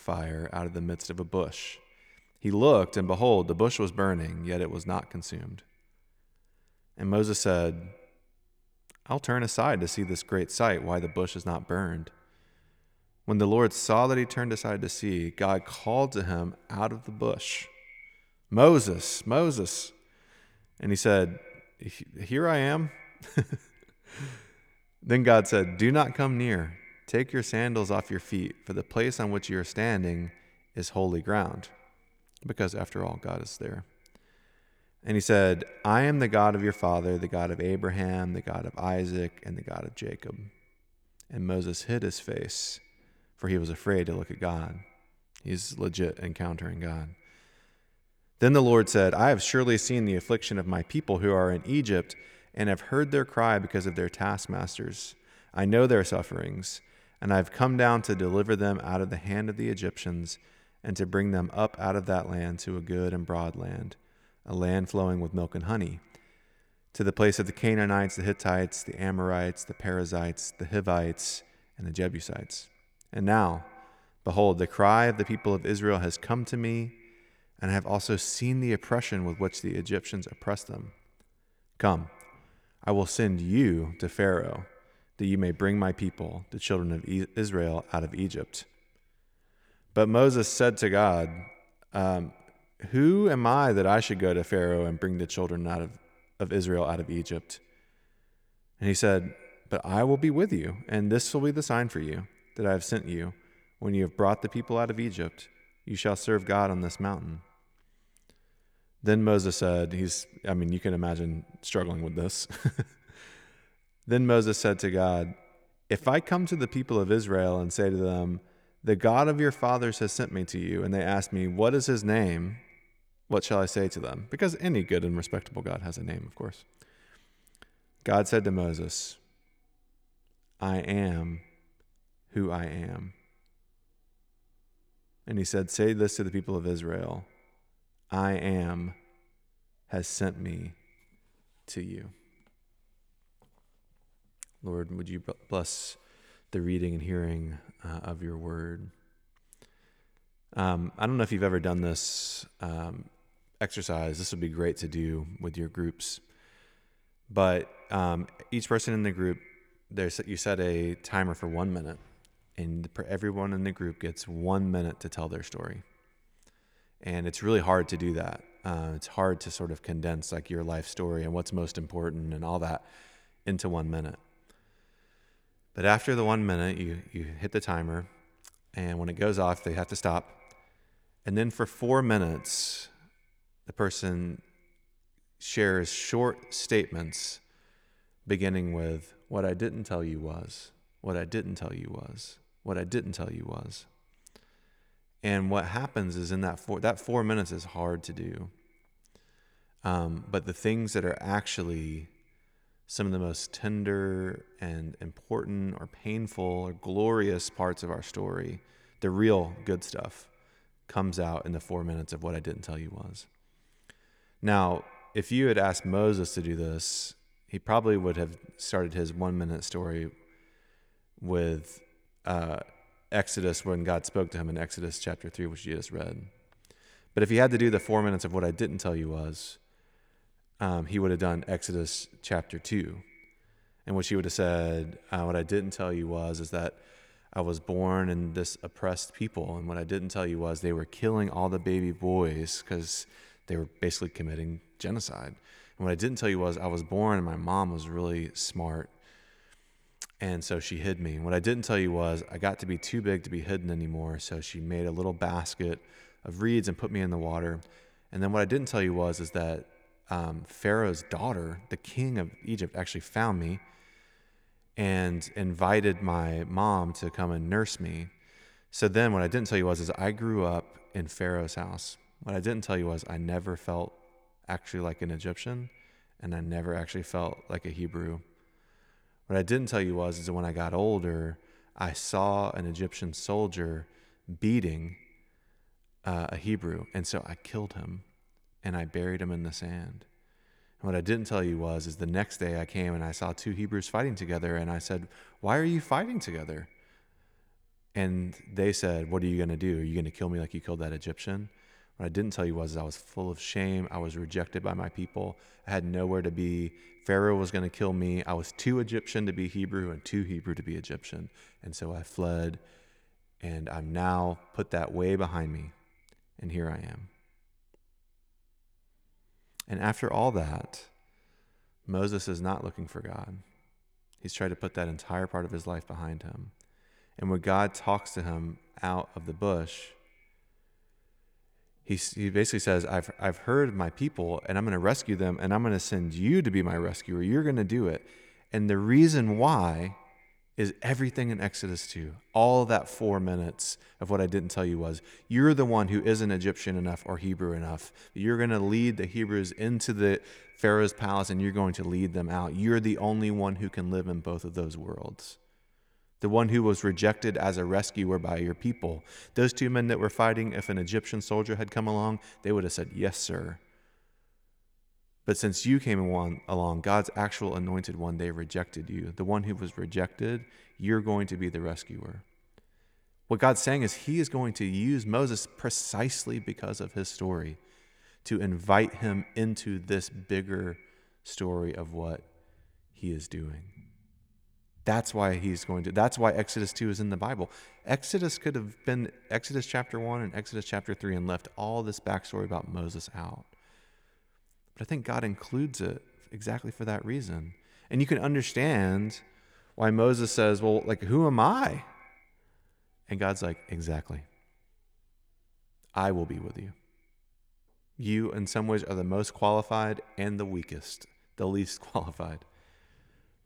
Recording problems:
echo of what is said; faint; throughout; 110 ms later, 25 dB below the speech

